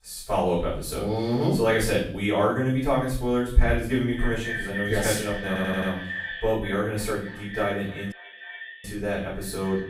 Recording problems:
echo of what is said; strong; from 4 s on; 280 ms later, 9 dB below the speech
off-mic speech; far
room echo; noticeable; dies away in 0.5 s
audio stuttering; at 5.5 s
audio cutting out; at 8 s for 0.5 s

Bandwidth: 15.5 kHz